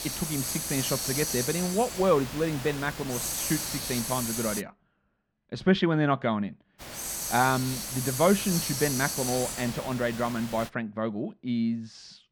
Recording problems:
muffled; slightly; fading above 2.5 kHz
hiss; loud; until 4.5 s and from 7 to 11 s; 3 dB below the speech

